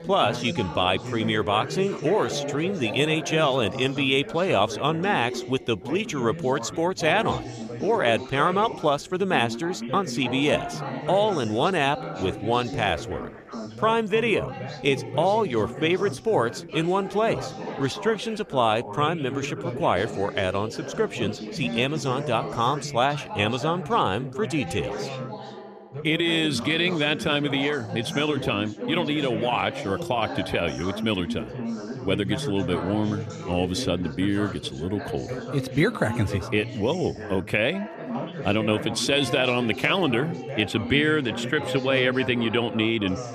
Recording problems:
background chatter; loud; throughout; 4 voices, 9 dB below the speech

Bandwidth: 14.5 kHz